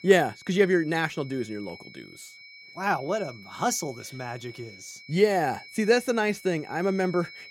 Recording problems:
high-pitched whine; noticeable; throughout; 2.5 kHz, 20 dB below the speech

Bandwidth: 16.5 kHz